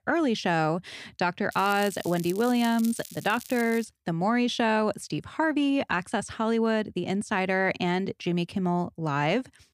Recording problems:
crackling; noticeable; from 1.5 to 4 s; 15 dB below the speech

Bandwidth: 15 kHz